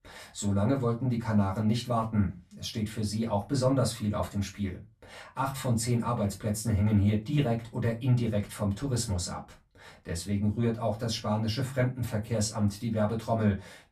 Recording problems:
off-mic speech; far
room echo; very slight; dies away in 0.2 s

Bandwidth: 14.5 kHz